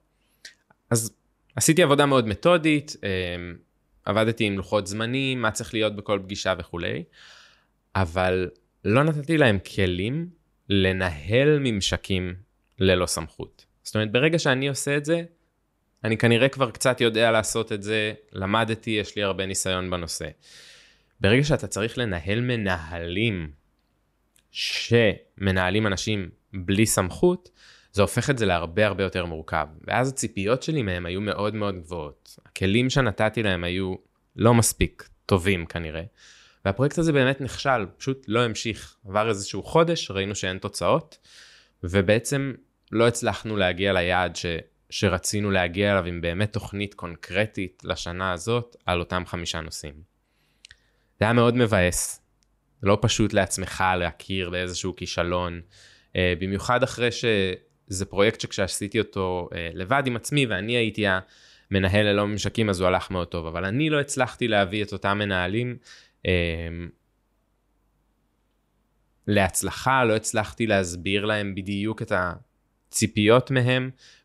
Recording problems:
none

